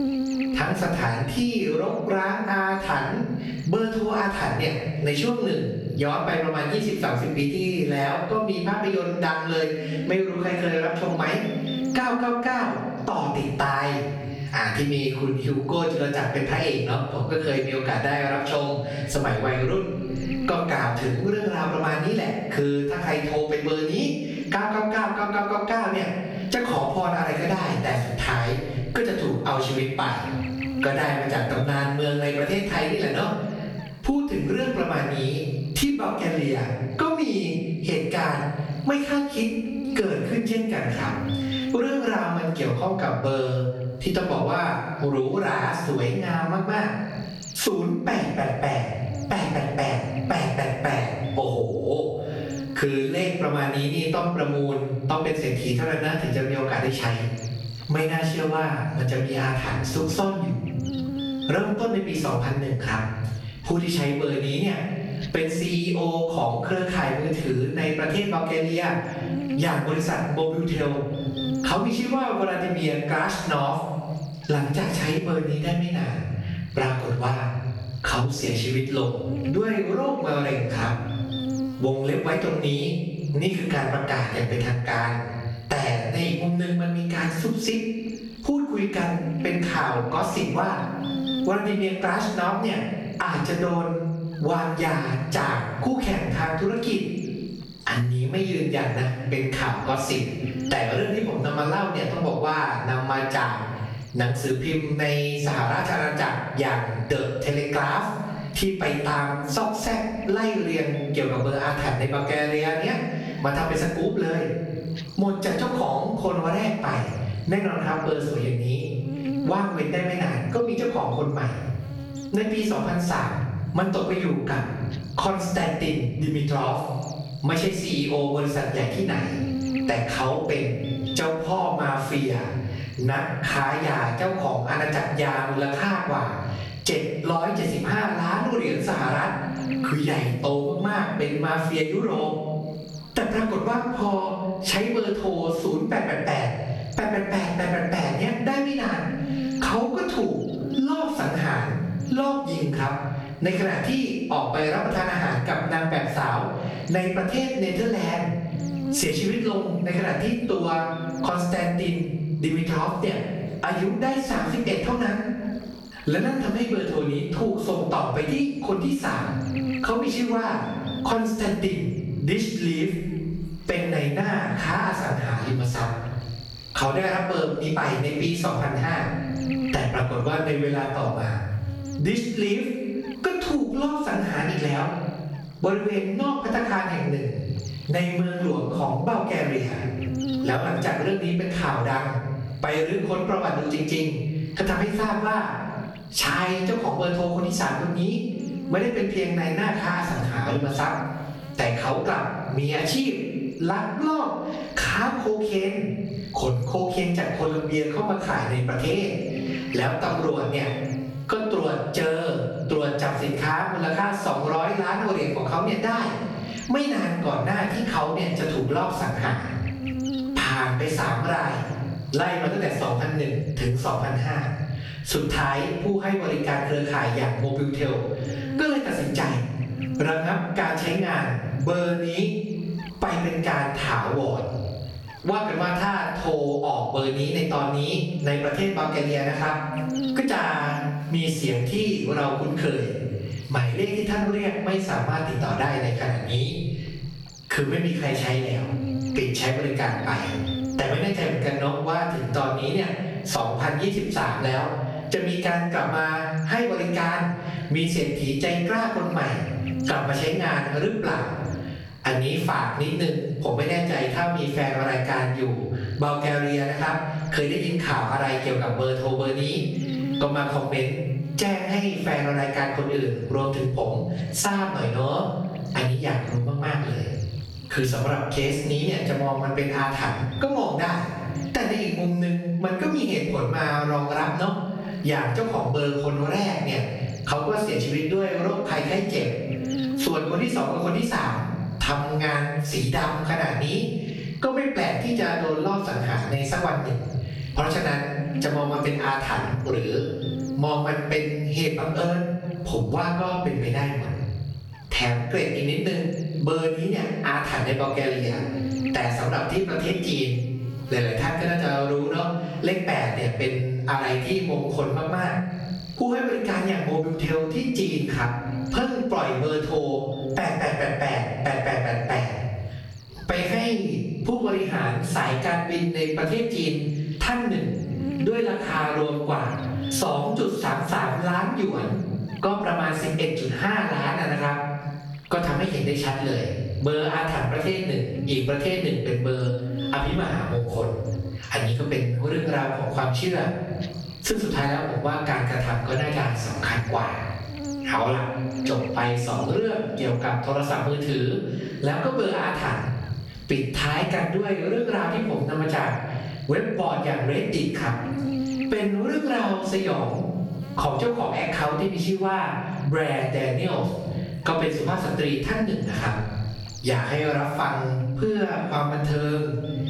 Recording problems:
off-mic speech; far
room echo; noticeable; dies away in 0.7 s
squashed, flat; somewhat
electrical hum; noticeable; throughout; 60 Hz, 15 dB below the speech

